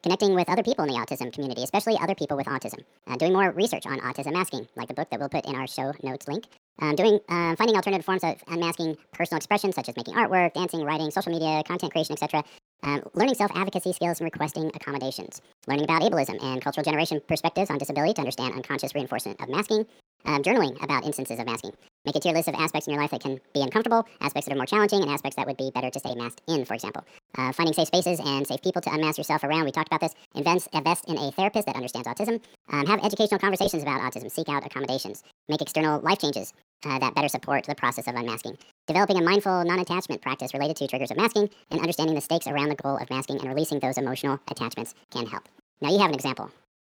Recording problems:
wrong speed and pitch; too fast and too high; 1.6 times normal speed

